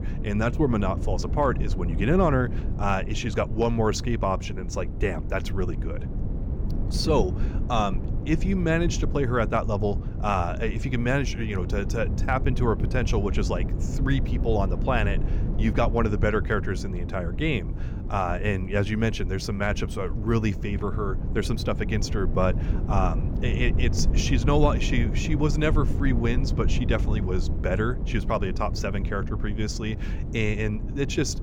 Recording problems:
low rumble; noticeable; throughout; 10 dB below the speech

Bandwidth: 17 kHz